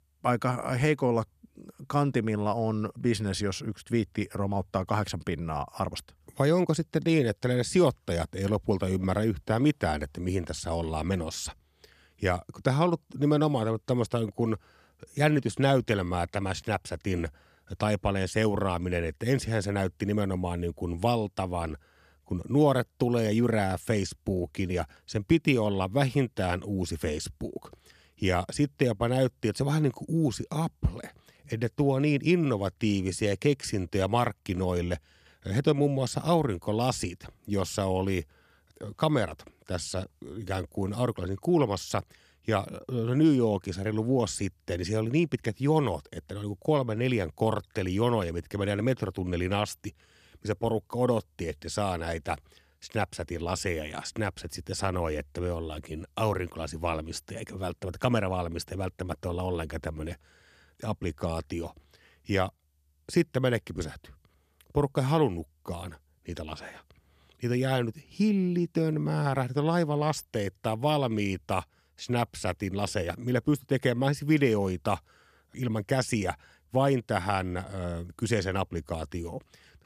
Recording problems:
none

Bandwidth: 14 kHz